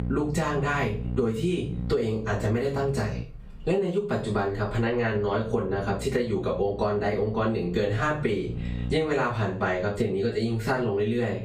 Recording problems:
off-mic speech; far
room echo; slight; dies away in 0.3 s
squashed, flat; somewhat
electrical hum; faint; until 3 s and from 5 to 9 s; 60 Hz, 20 dB below the speech

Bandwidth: 15.5 kHz